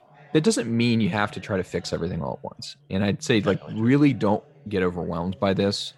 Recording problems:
background chatter; faint; throughout; 2 voices, 25 dB below the speech

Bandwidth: 16 kHz